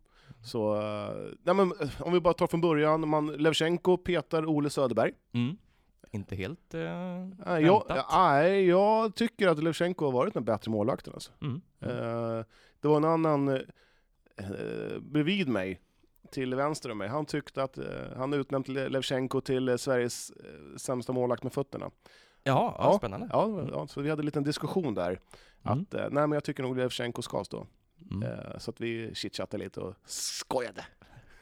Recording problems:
none

